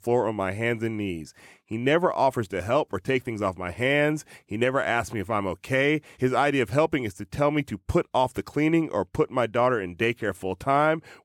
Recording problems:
none

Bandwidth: 17 kHz